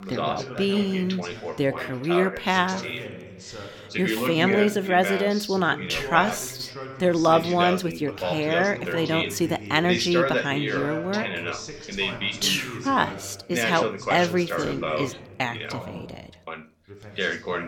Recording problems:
background chatter; loud; throughout; 2 voices, 5 dB below the speech

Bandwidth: 17.5 kHz